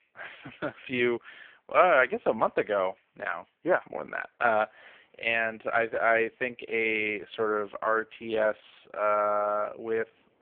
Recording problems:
phone-call audio; poor line
traffic noise; very faint; throughout; 45 dB below the speech

